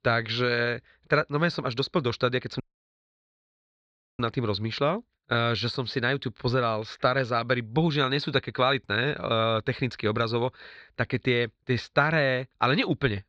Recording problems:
muffled; slightly; fading above 4 kHz
audio cutting out; at 2.5 s for 1.5 s

